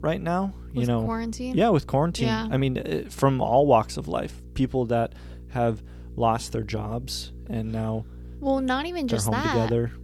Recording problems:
electrical hum; faint; throughout; 60 Hz, 30 dB below the speech

